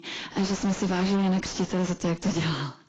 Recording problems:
distortion; heavy; 5 dB below the speech
garbled, watery; badly; nothing above 7.5 kHz

